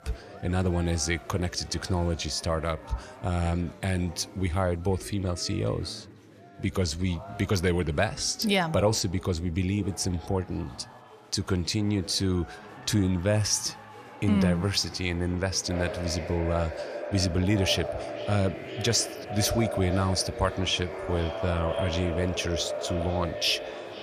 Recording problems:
echo of what is said; strong; from 16 s on; 490 ms later, 7 dB below the speech
chatter from many people; noticeable; throughout; 20 dB below the speech

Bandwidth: 14.5 kHz